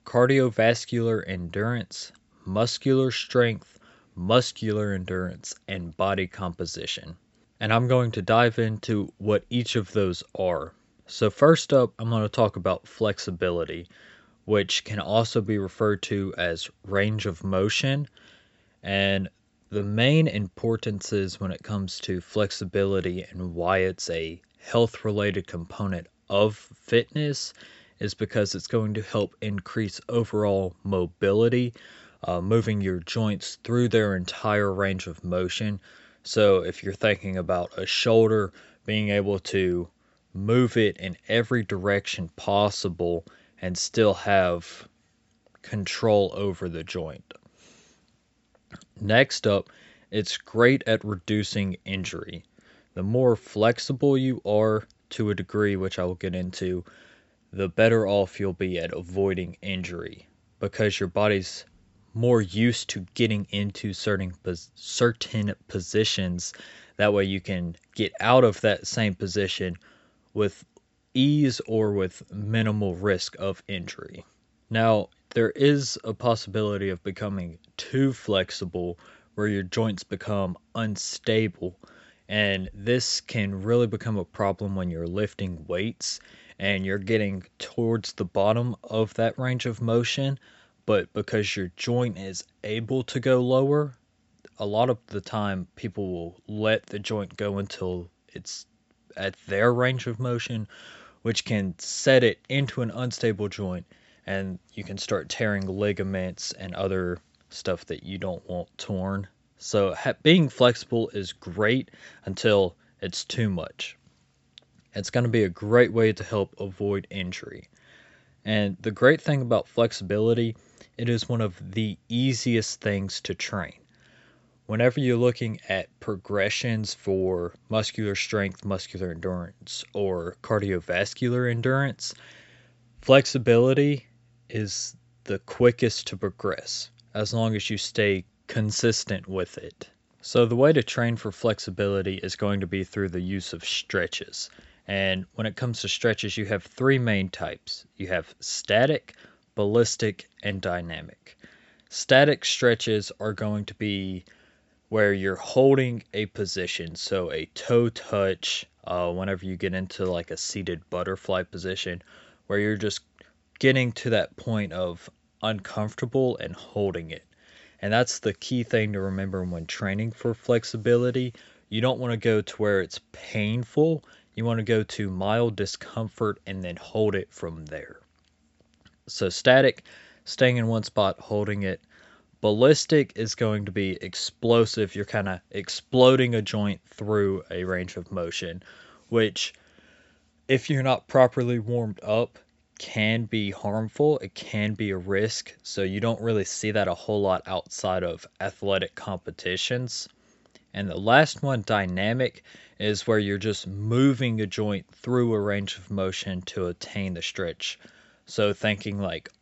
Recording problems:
high frequencies cut off; noticeable; nothing above 7.5 kHz

